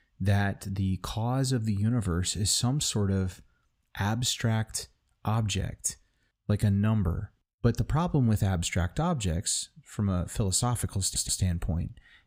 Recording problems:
audio stuttering; at 11 s

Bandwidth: 15.5 kHz